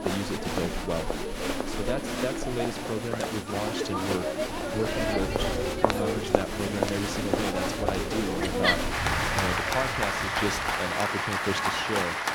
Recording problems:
crowd noise; very loud; throughout; 5 dB above the speech
wind noise on the microphone; occasional gusts; from 4.5 to 11 s; 20 dB below the speech
high-pitched whine; faint; throughout; 10 kHz, 20 dB below the speech
rain or running water; very faint; throughout; 25 dB below the speech

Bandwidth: 17 kHz